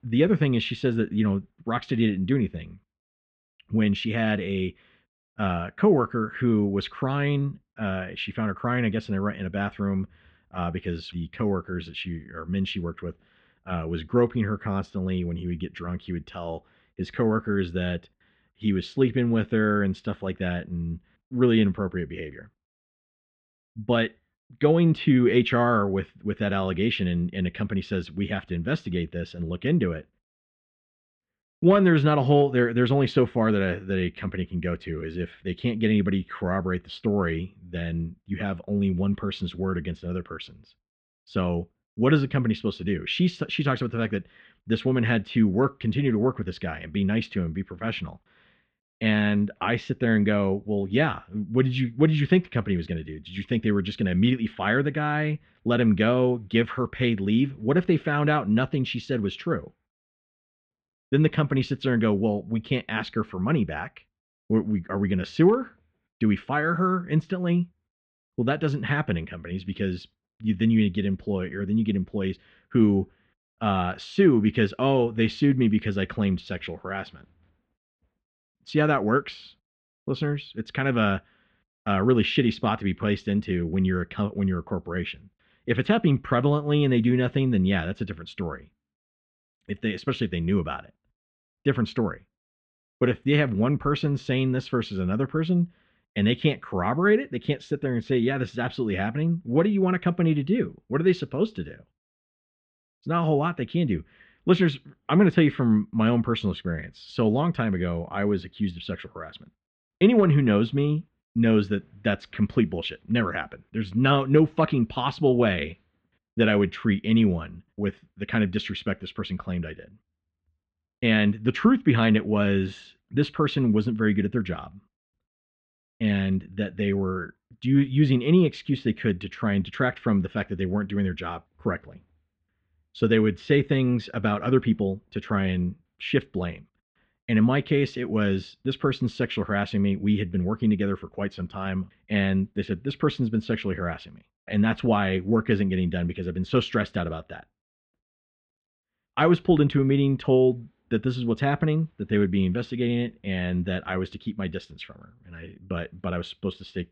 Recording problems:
muffled; very; fading above 3.5 kHz

